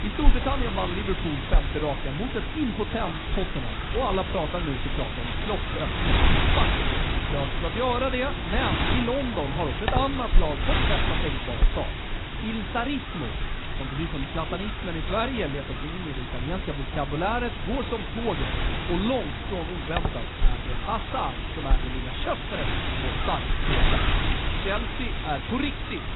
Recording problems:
garbled, watery; badly; nothing above 4 kHz
wind noise on the microphone; heavy; as loud as the speech
animal sounds; very faint; throughout; 20 dB below the speech

